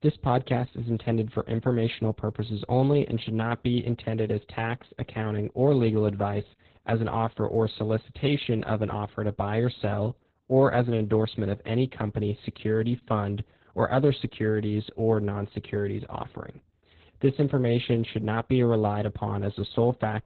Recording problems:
garbled, watery; badly; nothing above 4 kHz

